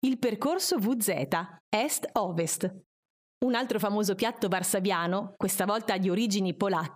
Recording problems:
squashed, flat; somewhat

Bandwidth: 15 kHz